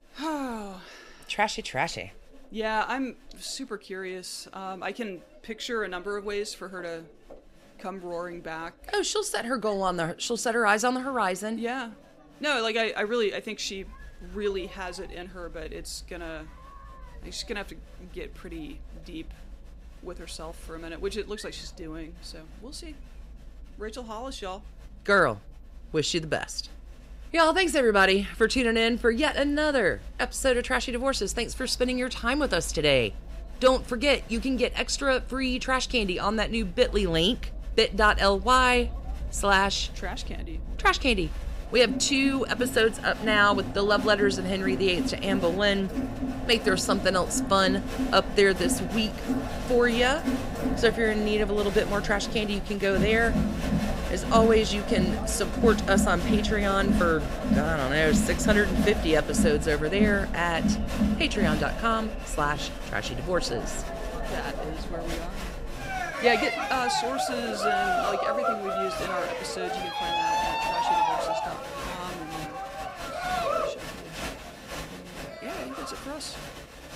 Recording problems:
crowd noise; loud; throughout; 5 dB below the speech

